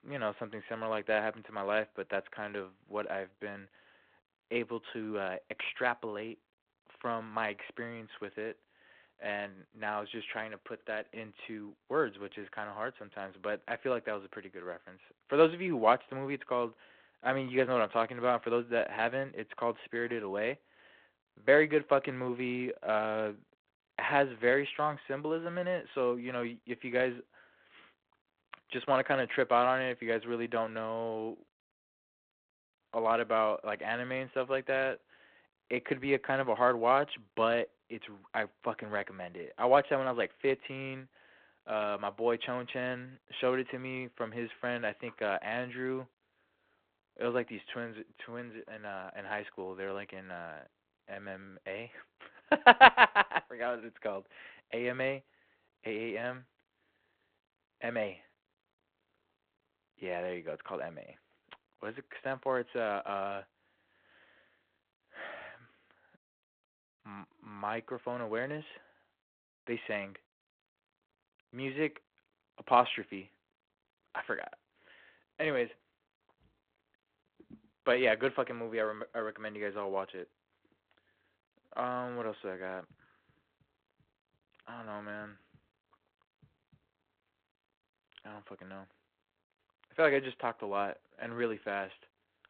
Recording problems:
phone-call audio

